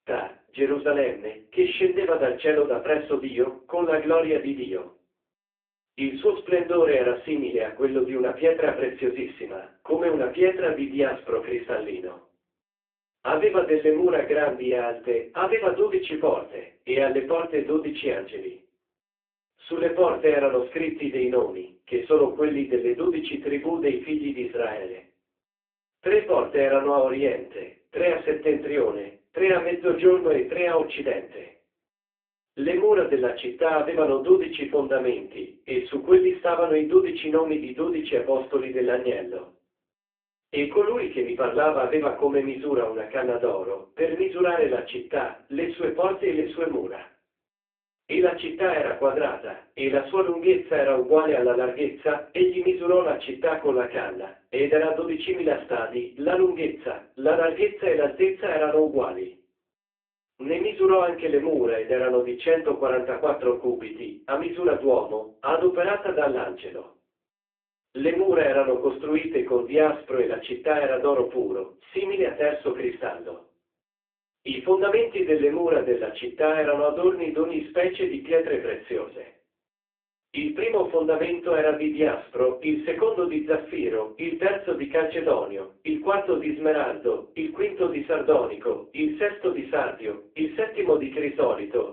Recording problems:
phone-call audio; poor line; nothing above 3.5 kHz
off-mic speech; far
room echo; slight; dies away in 0.3 s

